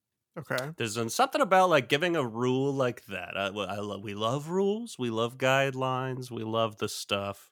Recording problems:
none

